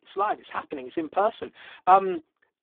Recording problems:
phone-call audio; poor line

